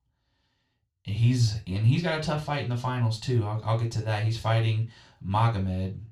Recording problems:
room echo; slight; dies away in 0.3 s
off-mic speech; somewhat distant

